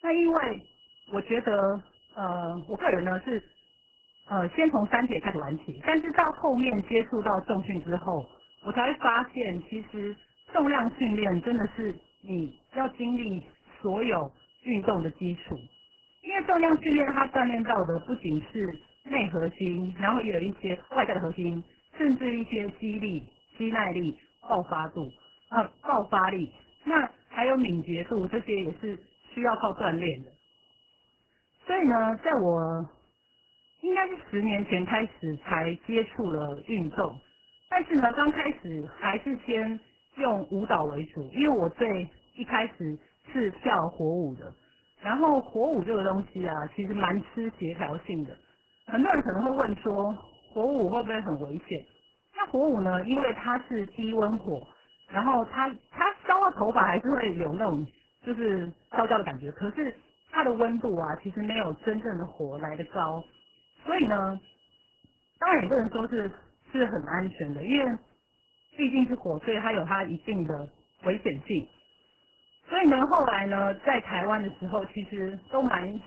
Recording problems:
garbled, watery; badly; nothing above 3 kHz
high-pitched whine; faint; throughout; 3 kHz, 30 dB below the speech
uneven, jittery; strongly; from 1 s to 1:07

